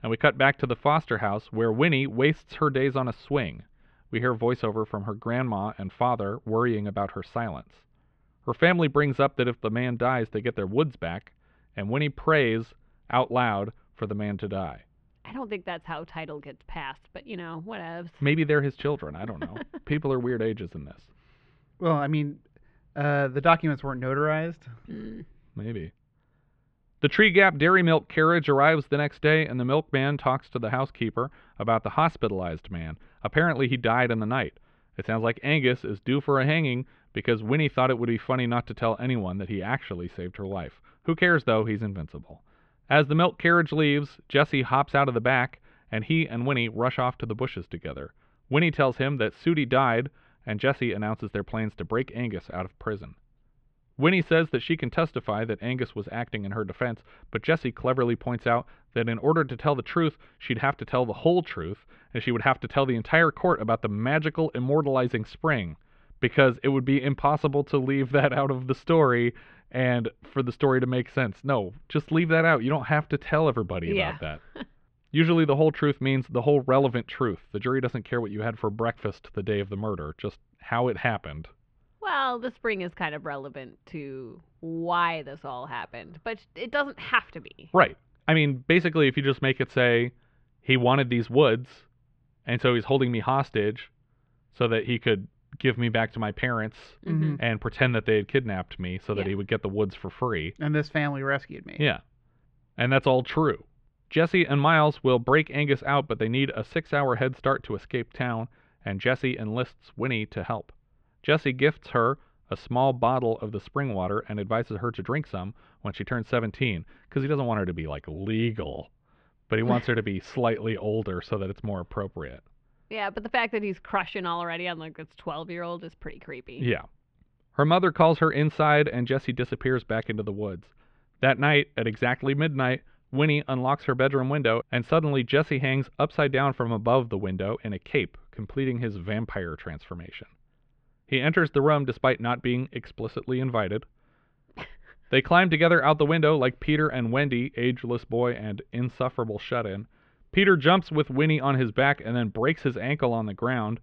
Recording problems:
muffled; very; fading above 3 kHz

